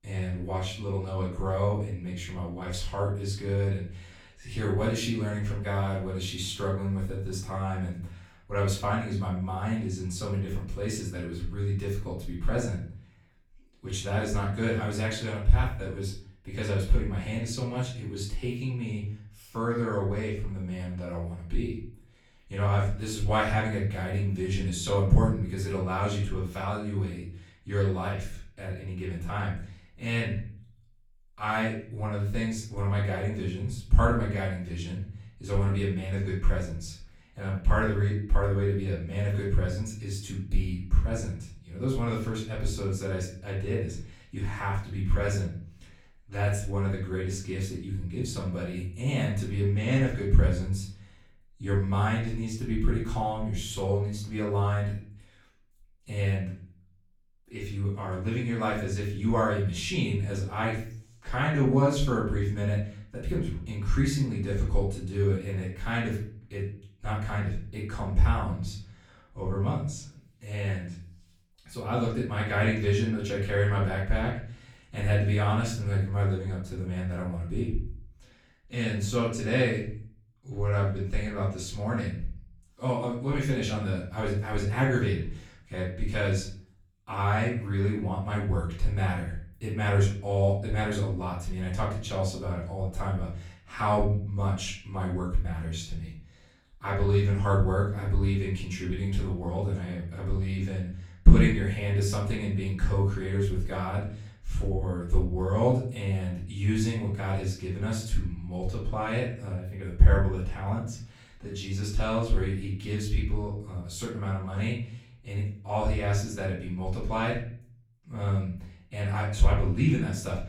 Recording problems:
off-mic speech; far
room echo; noticeable; dies away in 0.5 s

